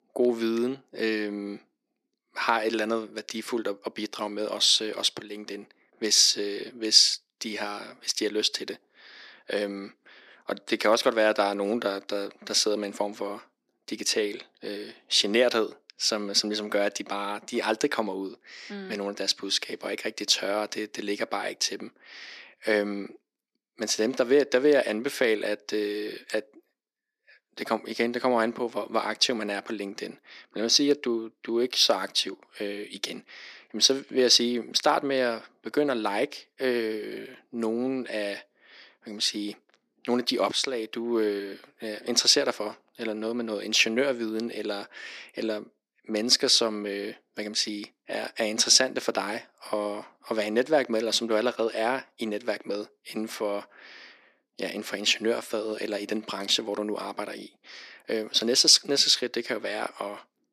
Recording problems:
thin; somewhat; fading below 300 Hz

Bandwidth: 14 kHz